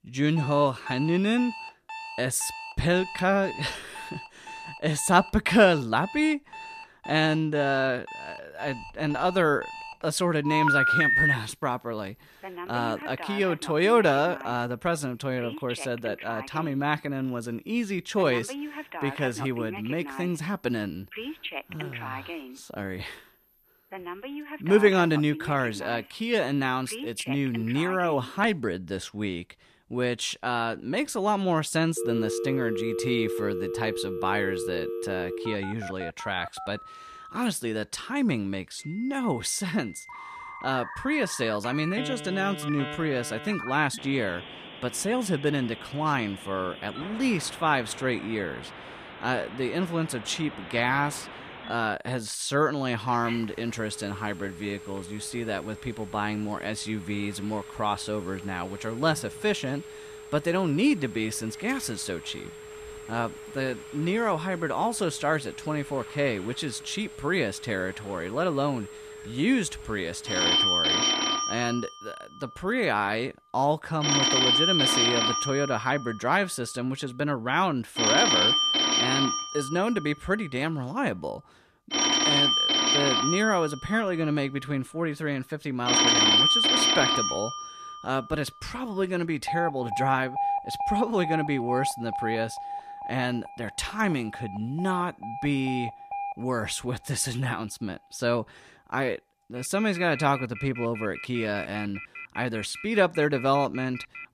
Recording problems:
alarms or sirens; very loud; throughout; as loud as the speech

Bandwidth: 14.5 kHz